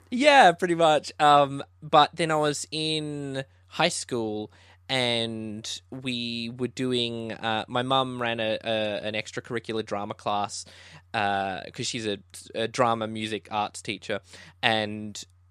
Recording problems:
none

